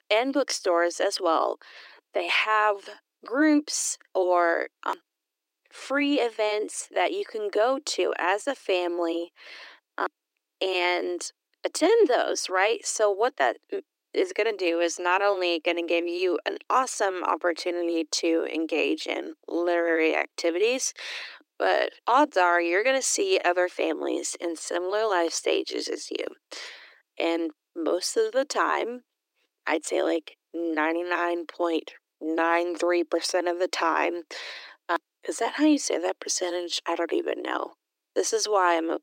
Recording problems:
thin; somewhat; fading below 300 Hz

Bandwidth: 16 kHz